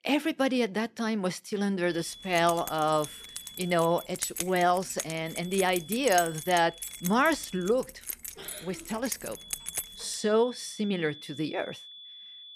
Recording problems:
high-pitched whine; noticeable; from 2 to 4 s, from 5 to 7.5 s and from 9.5 s on; 3.5 kHz, 15 dB below the speech
jangling keys; noticeable; from 2 to 10 s; peak 4 dB below the speech

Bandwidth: 14 kHz